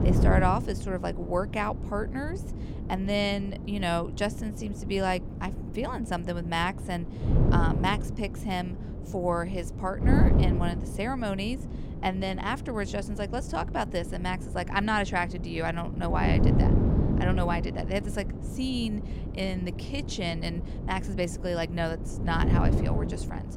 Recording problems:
wind noise on the microphone; heavy; 8 dB below the speech

